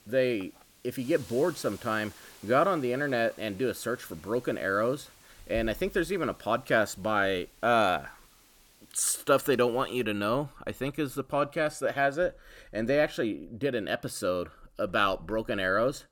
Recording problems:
hiss; faint; until 10 s; 25 dB below the speech

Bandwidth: 17.5 kHz